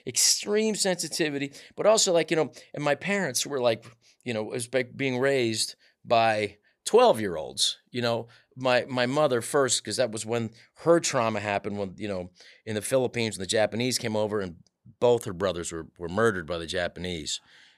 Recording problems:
none

